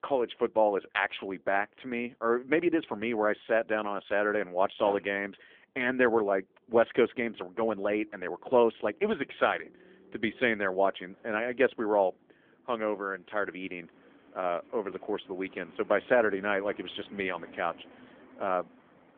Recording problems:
phone-call audio; nothing above 3.5 kHz
traffic noise; faint; throughout; 25 dB below the speech

